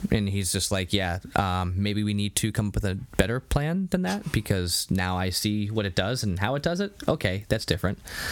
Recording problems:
squashed, flat; somewhat

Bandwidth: 17.5 kHz